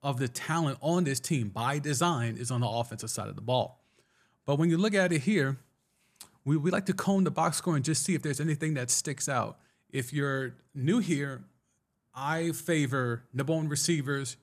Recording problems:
none

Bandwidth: 14.5 kHz